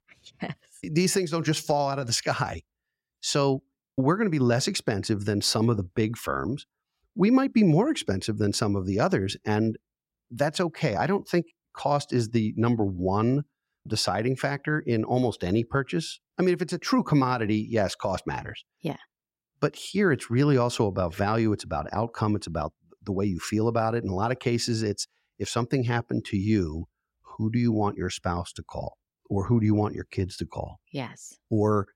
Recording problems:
none

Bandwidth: 16 kHz